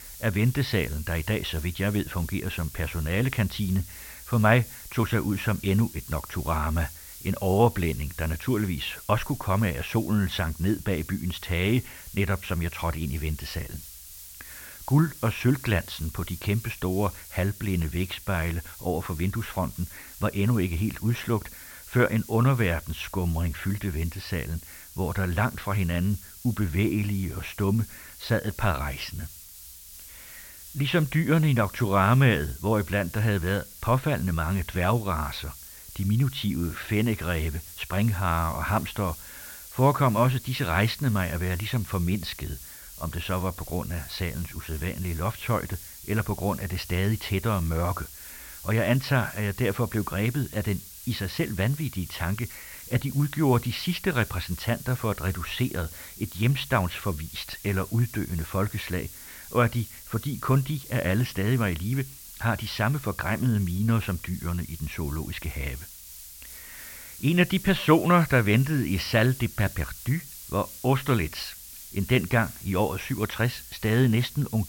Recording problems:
high frequencies cut off; noticeable; nothing above 6 kHz
hiss; noticeable; throughout; 15 dB below the speech

